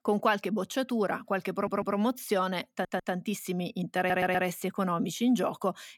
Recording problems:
audio stuttering; at 1.5 s, at 2.5 s and at 4 s

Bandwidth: 17 kHz